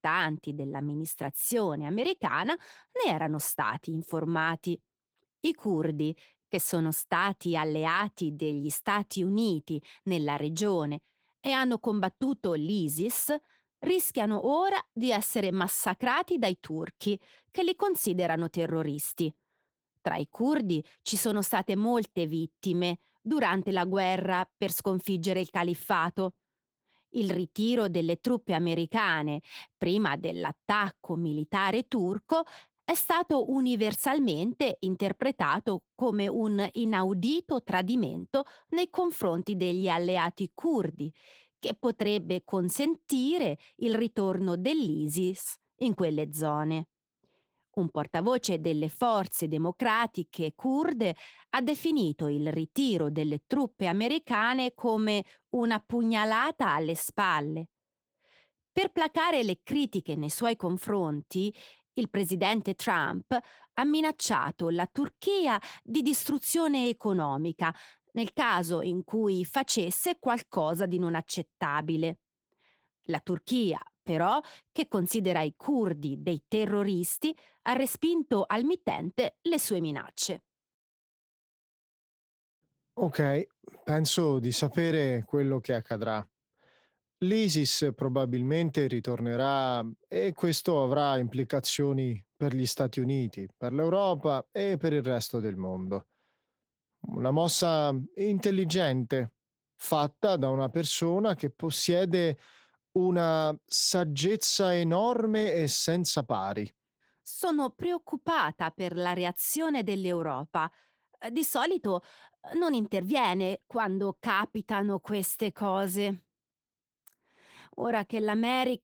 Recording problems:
garbled, watery; slightly; nothing above 19 kHz

